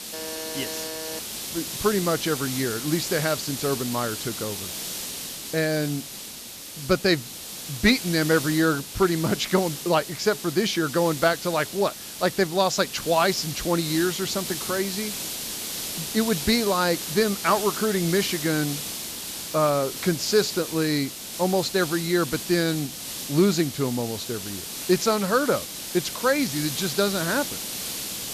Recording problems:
high frequencies cut off; noticeable; nothing above 8 kHz
hiss; loud; throughout; 7 dB below the speech
alarm; faint; until 1 s; peak 10 dB below the speech

